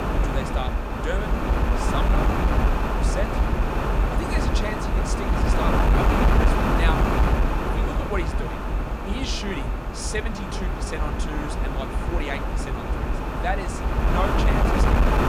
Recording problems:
wind noise on the microphone; heavy; 5 dB above the speech

